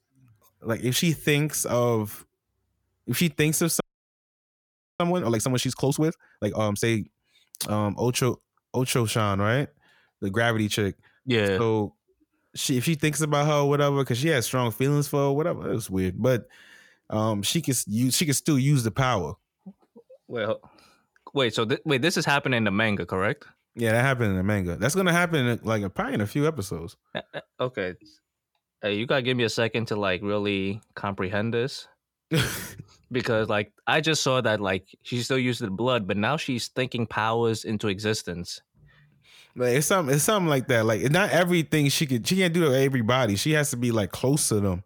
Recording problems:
audio freezing; at 4 s for 1 s

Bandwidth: 18.5 kHz